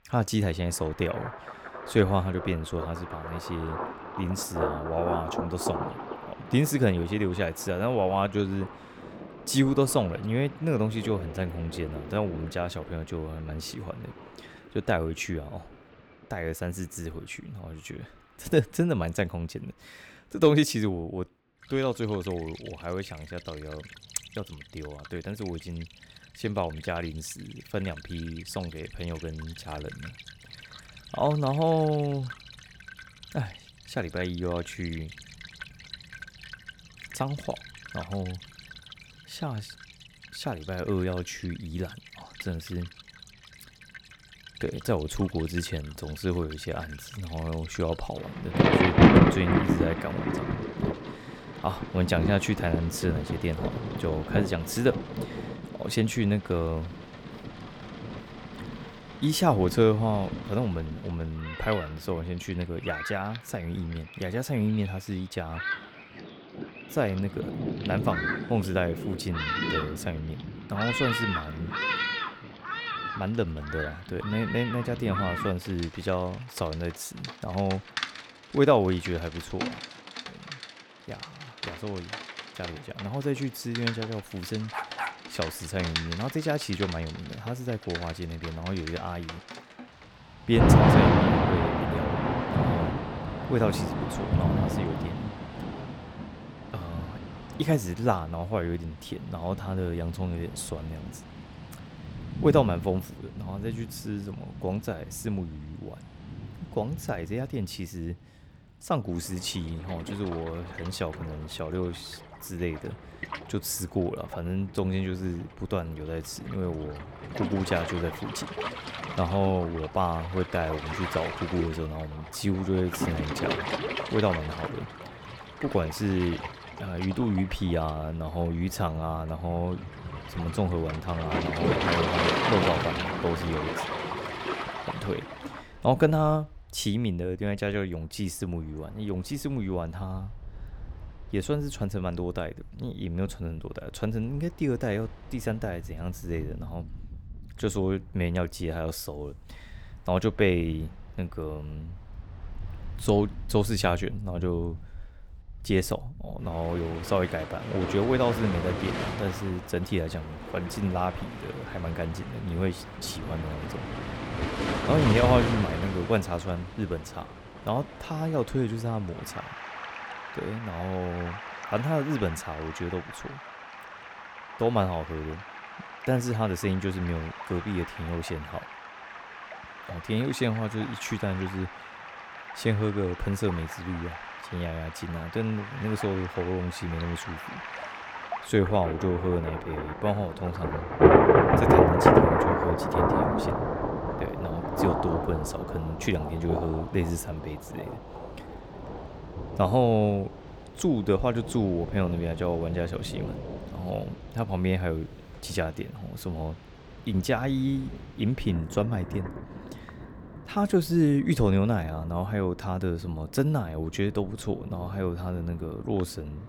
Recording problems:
rain or running water; loud; throughout; 1 dB below the speech
dog barking; noticeable; at 1:25; peak 3 dB below the speech

